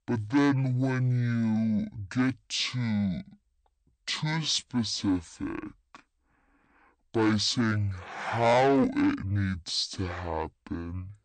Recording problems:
distortion; heavy; 8 dB below the speech
wrong speed and pitch; too slow and too low; 0.5 times normal speed

